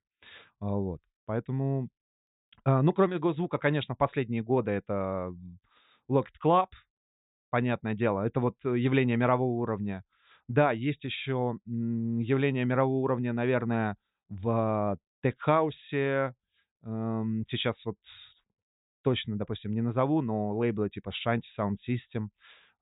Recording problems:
high frequencies cut off; severe; nothing above 4 kHz

